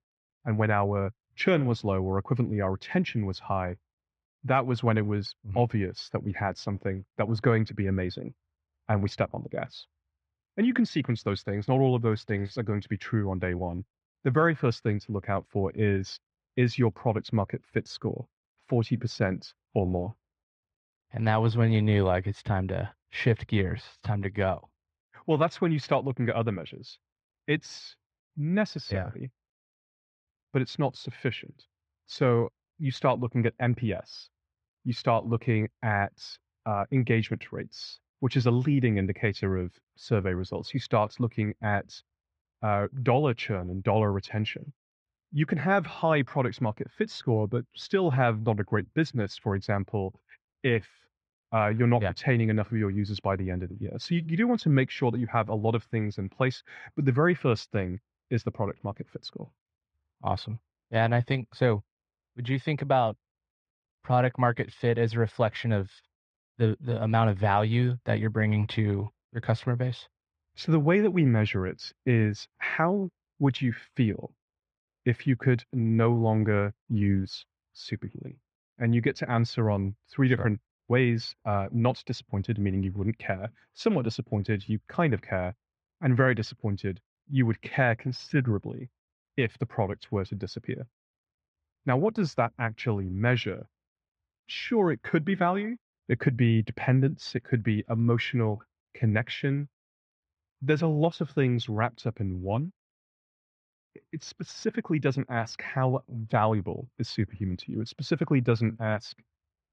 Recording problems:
muffled; very; fading above 2 kHz

